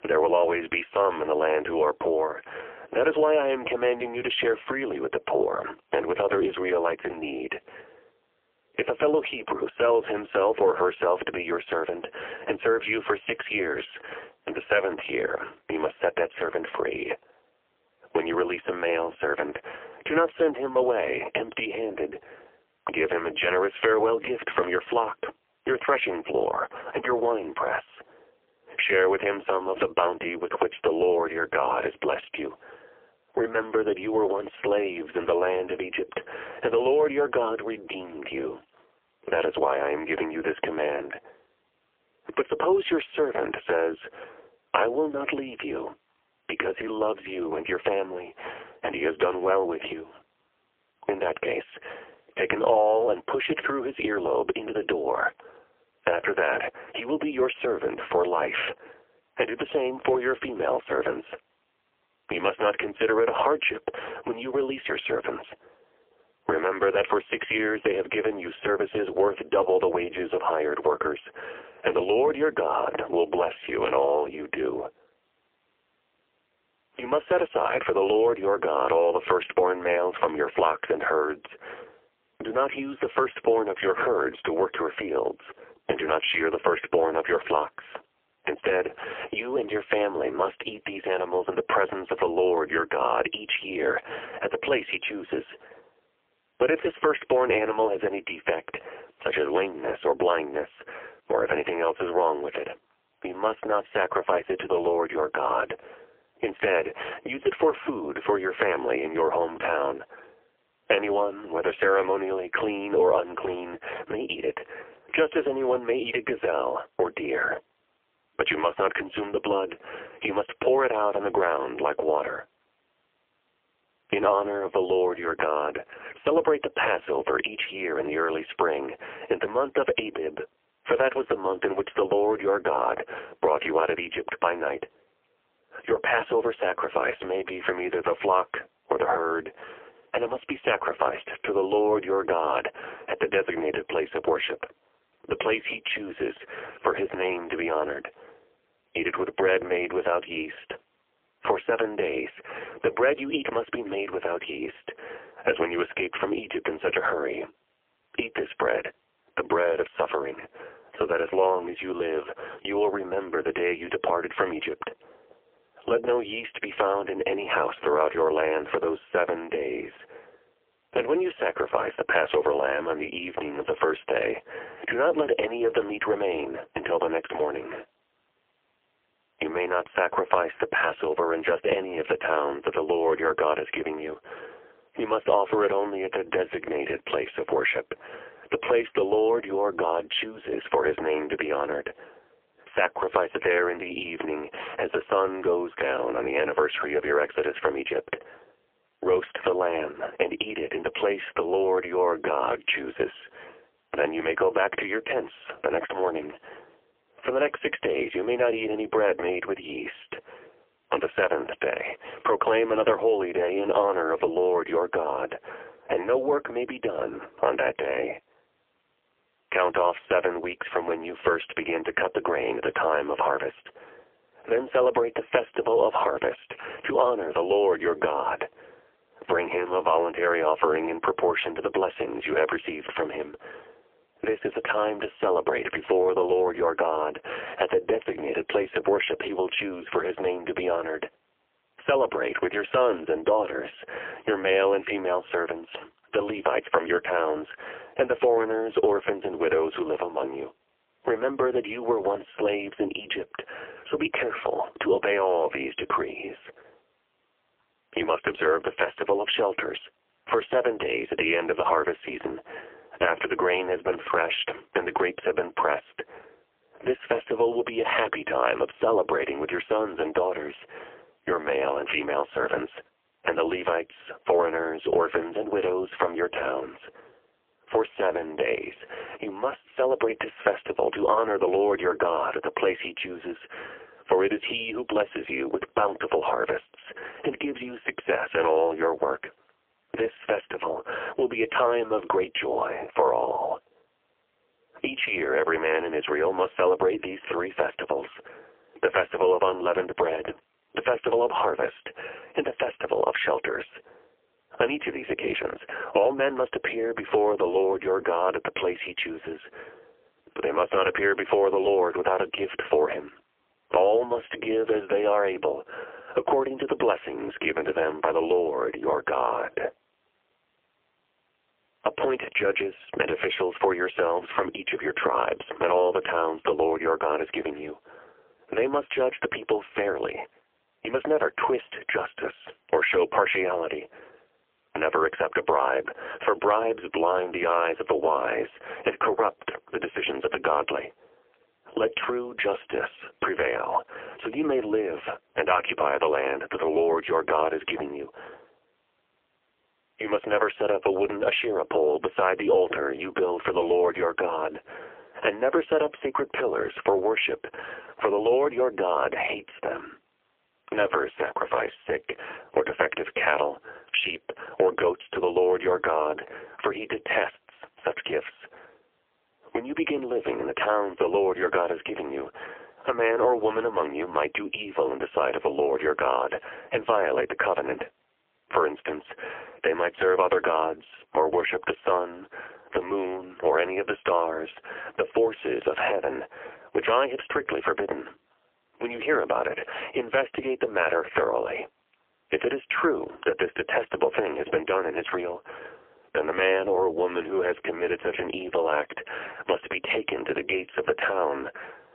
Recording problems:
phone-call audio; poor line; nothing above 3 kHz
squashed, flat; heavily

